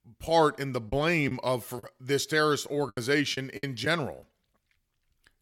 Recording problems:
choppy; very; 7% of the speech affected

